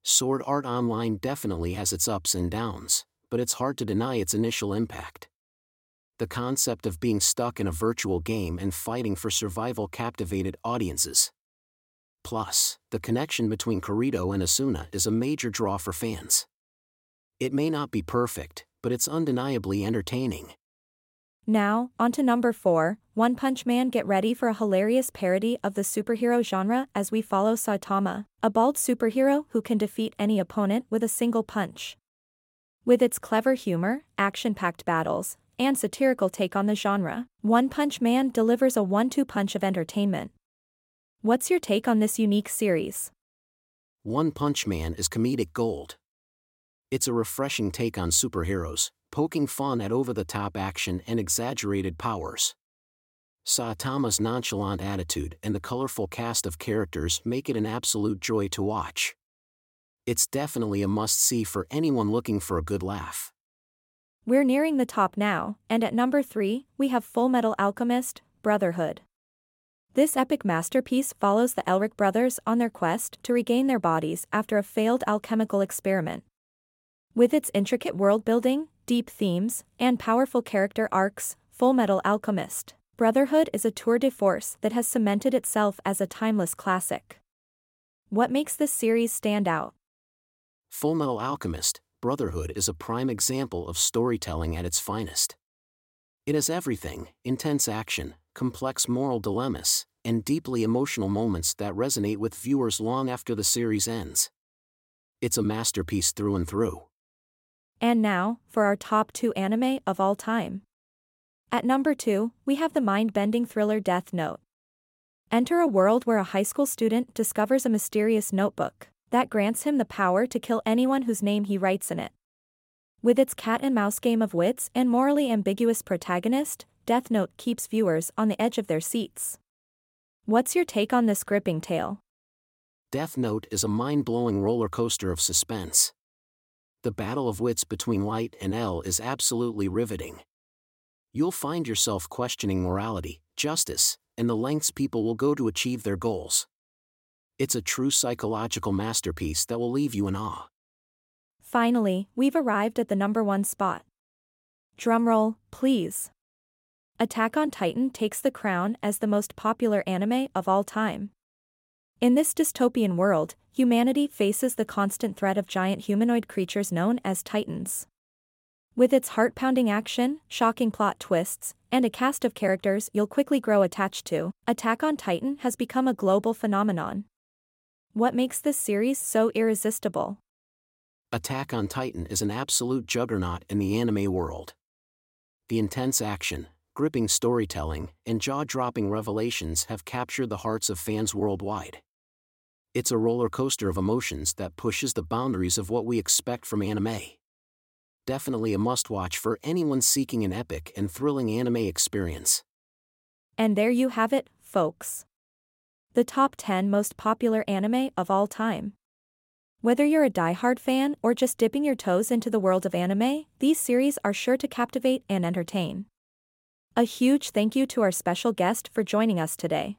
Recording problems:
none

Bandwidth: 16.5 kHz